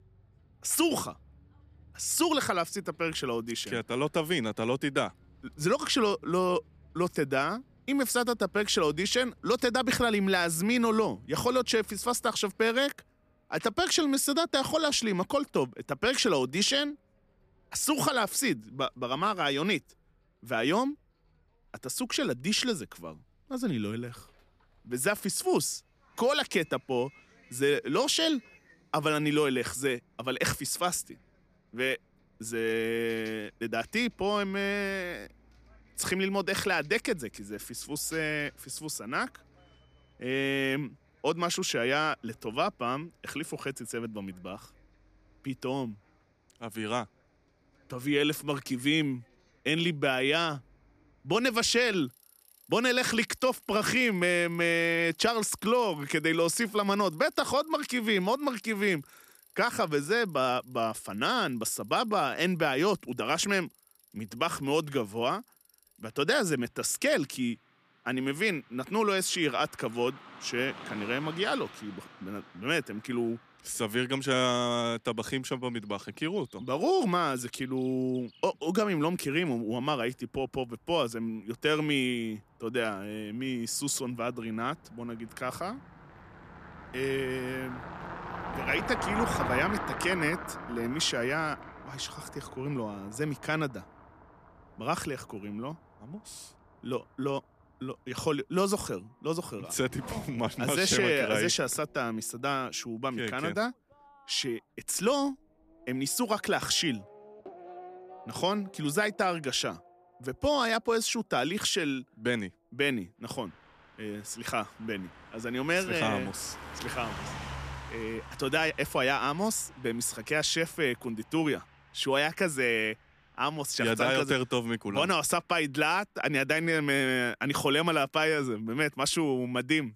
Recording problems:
traffic noise; noticeable; throughout; 15 dB below the speech

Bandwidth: 14.5 kHz